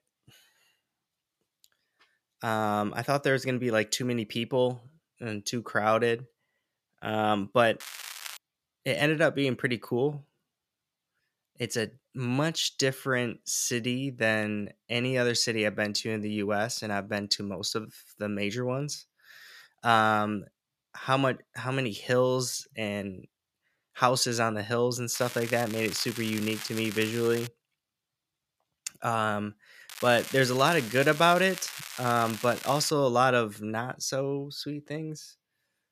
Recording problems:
crackling; noticeable; at 8 s, from 25 to 27 s and from 30 to 33 s; 10 dB below the speech

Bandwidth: 14.5 kHz